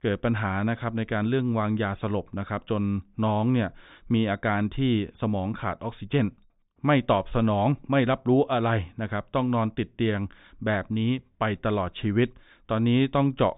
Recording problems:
high frequencies cut off; severe; nothing above 3.5 kHz

